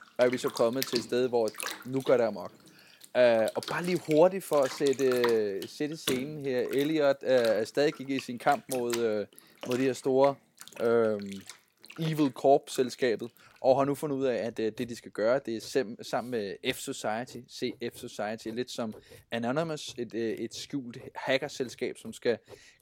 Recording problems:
household noises; noticeable; throughout; 10 dB below the speech

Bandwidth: 16.5 kHz